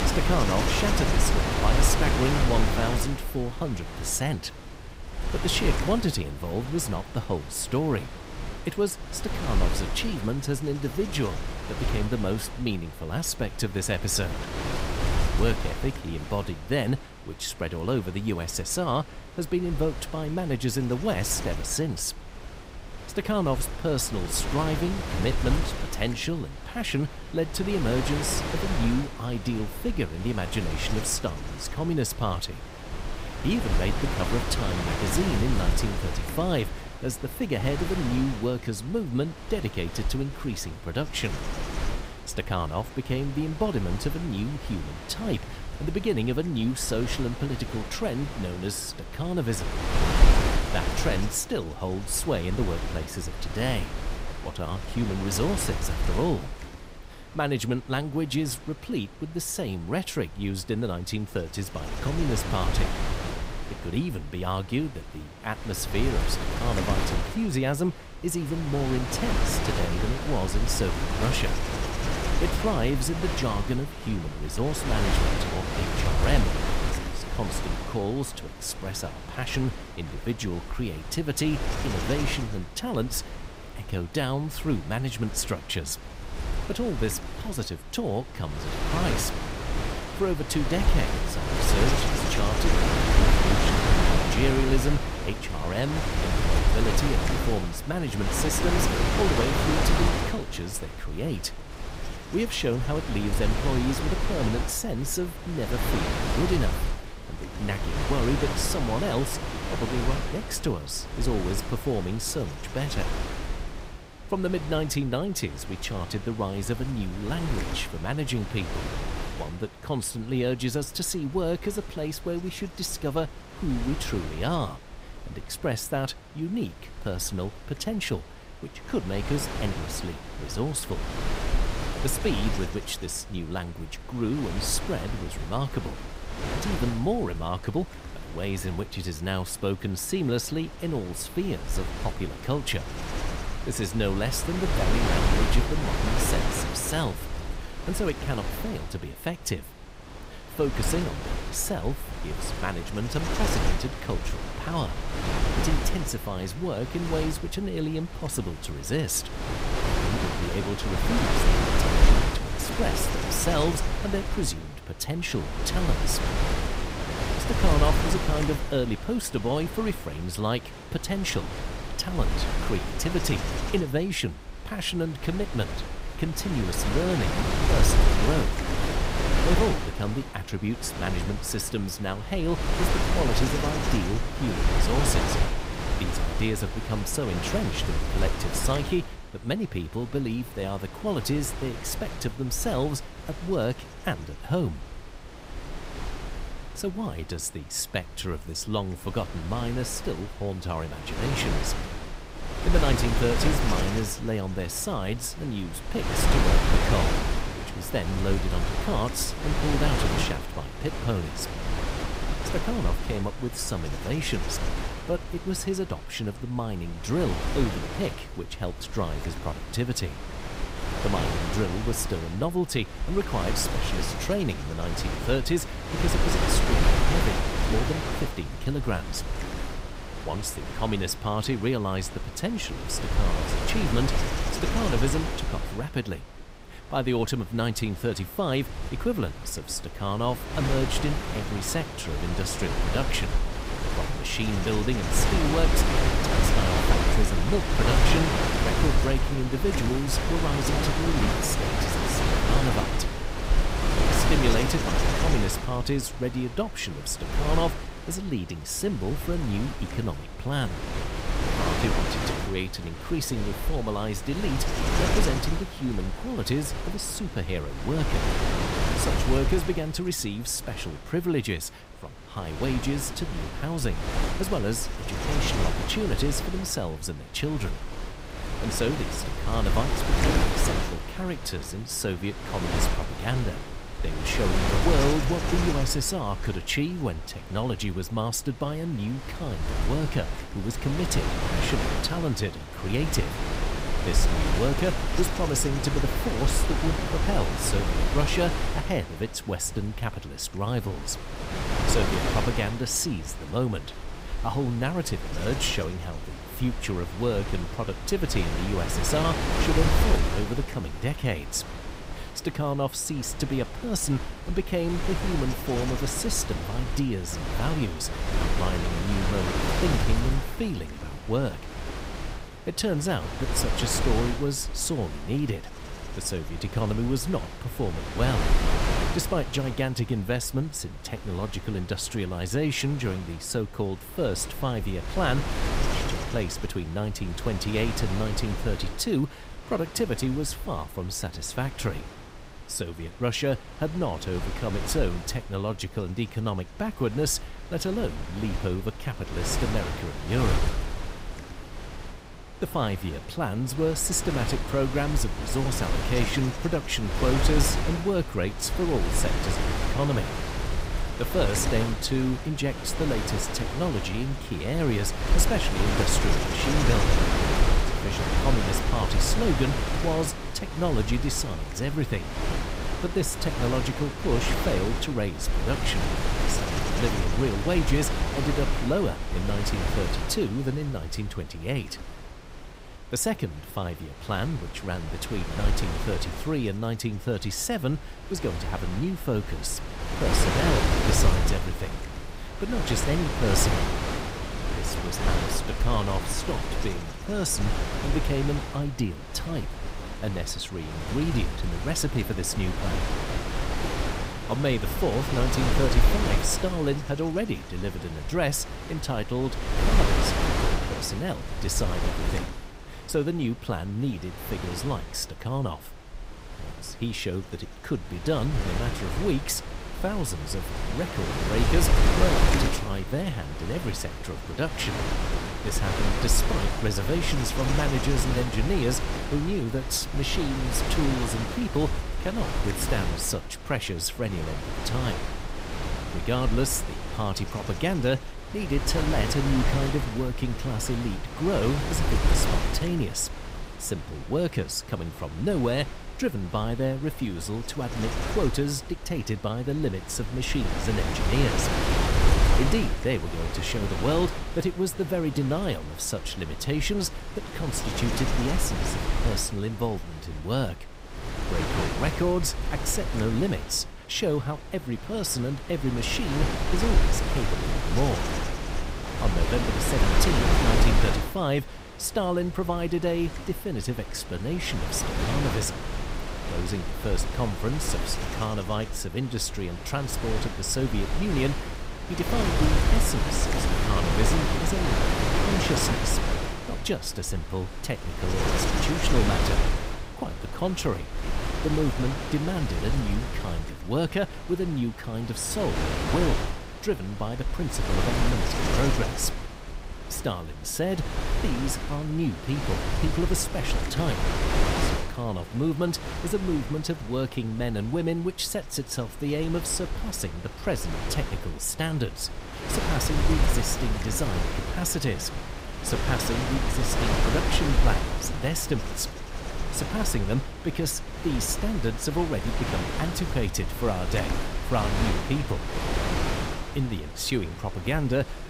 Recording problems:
wind noise on the microphone; heavy; 1 dB below the speech

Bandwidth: 15.5 kHz